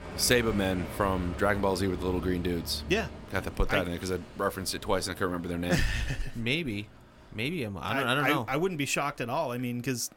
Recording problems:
traffic noise; noticeable; throughout; 15 dB below the speech

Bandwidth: 16.5 kHz